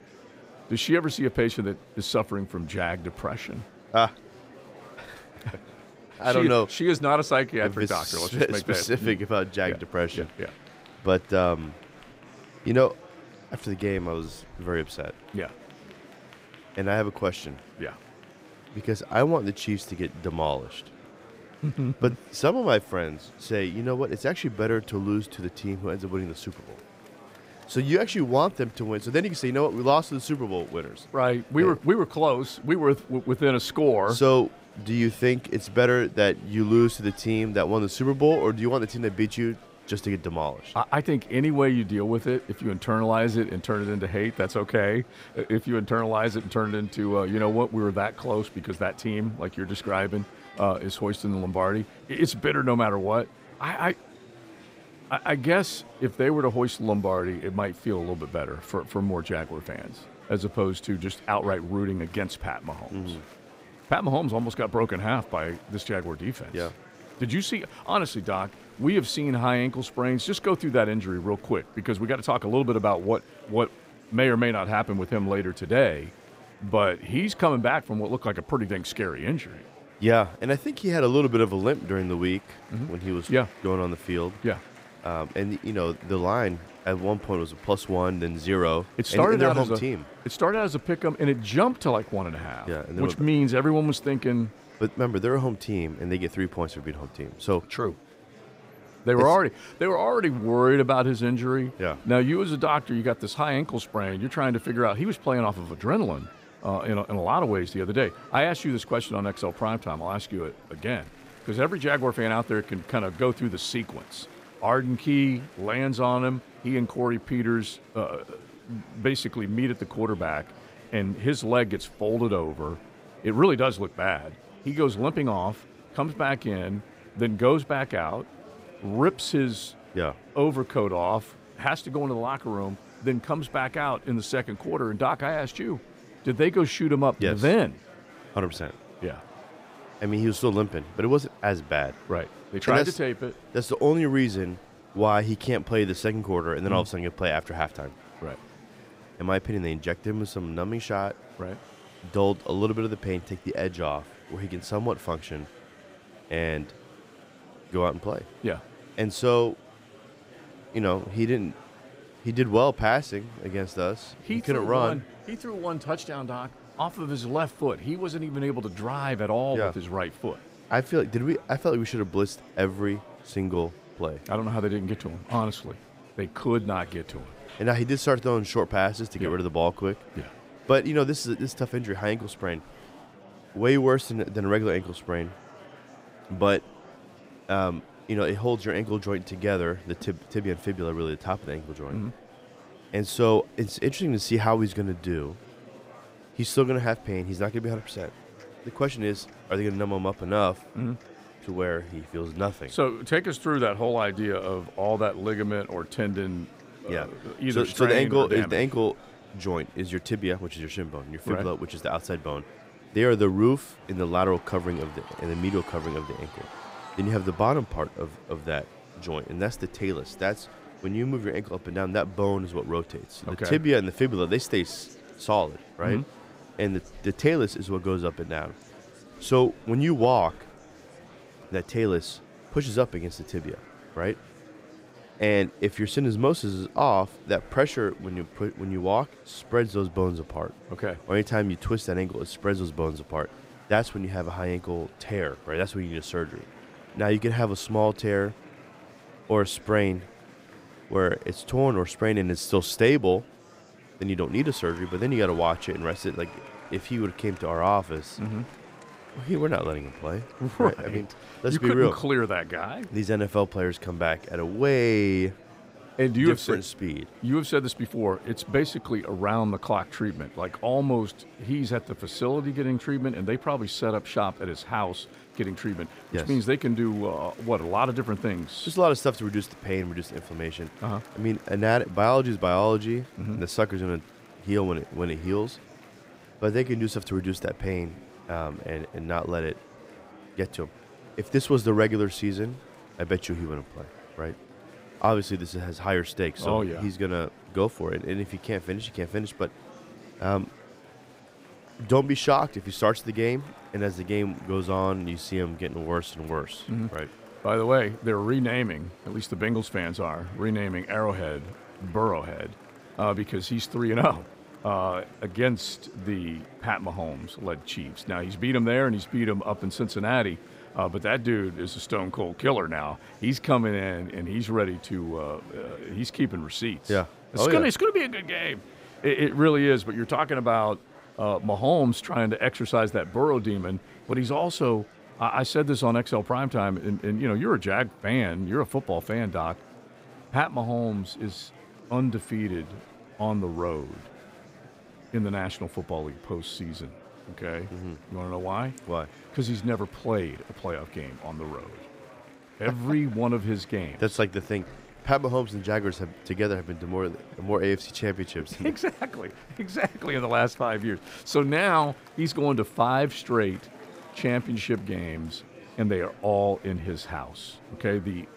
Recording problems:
murmuring crowd; faint; throughout; 20 dB below the speech

